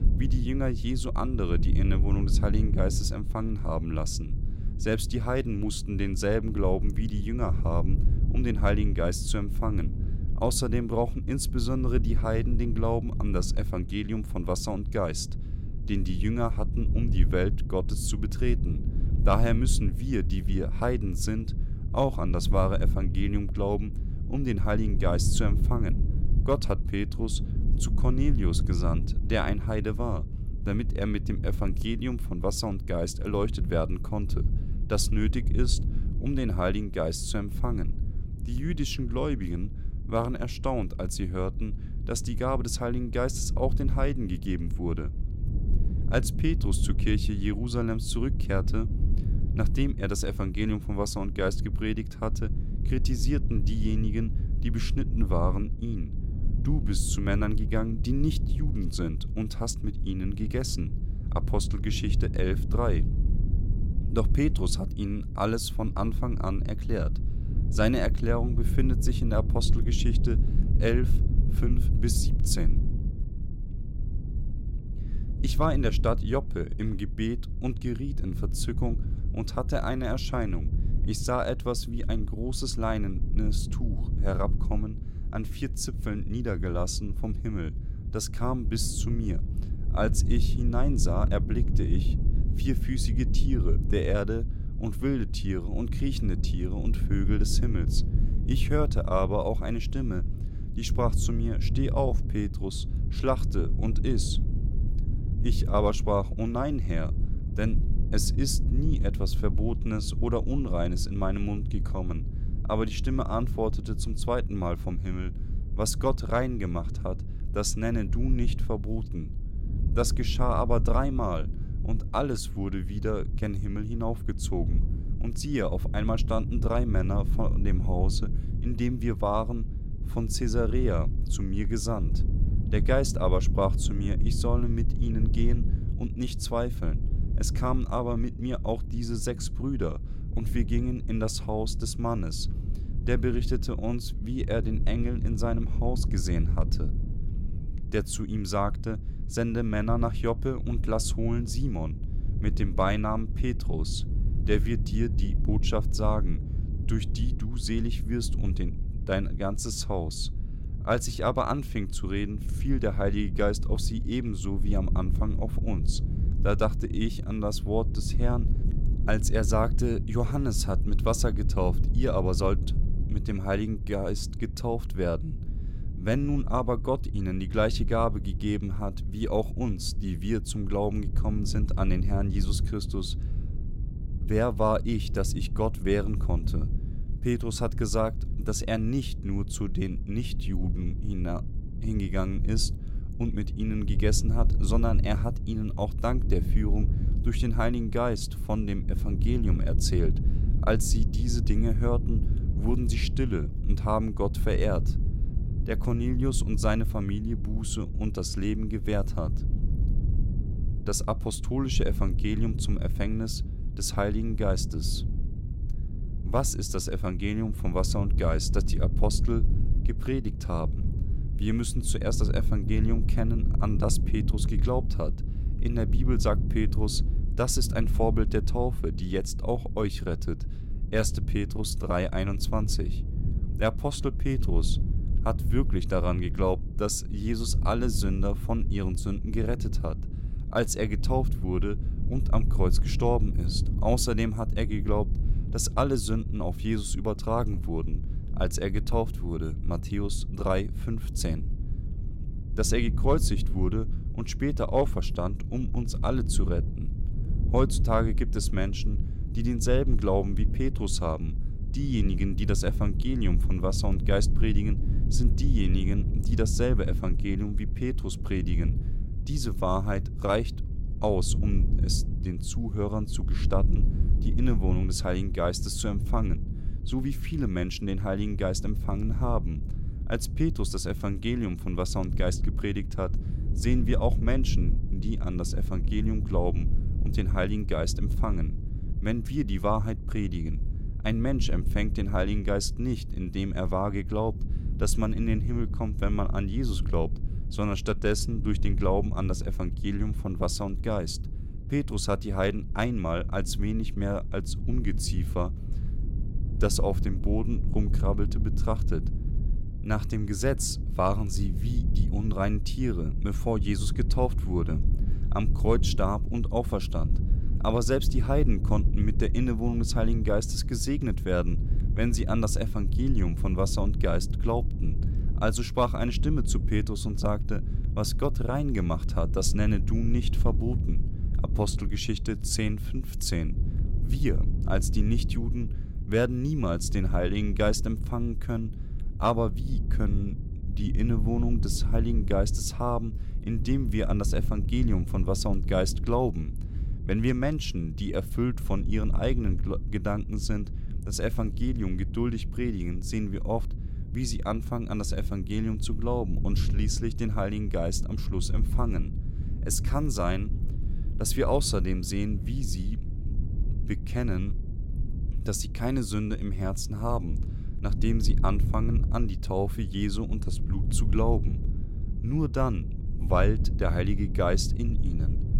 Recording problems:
low rumble; noticeable; throughout; 15 dB below the speech

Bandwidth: 16 kHz